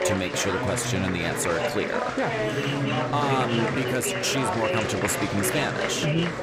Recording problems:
chatter from many people; very loud; throughout; as loud as the speech

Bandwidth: 15.5 kHz